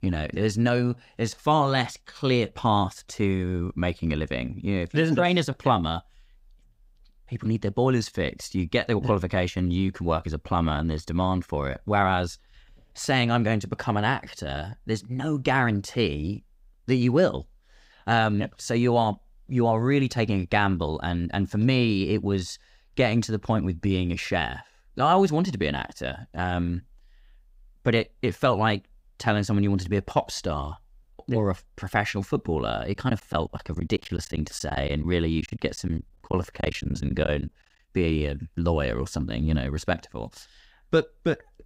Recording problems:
choppy; very; from 33 to 37 s; 11% of the speech affected

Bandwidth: 15.5 kHz